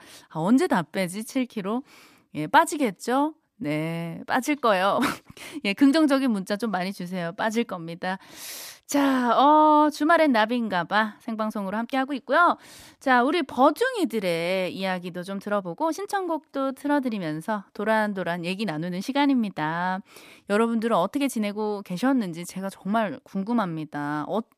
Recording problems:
uneven, jittery; strongly; from 1 to 24 s

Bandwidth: 14.5 kHz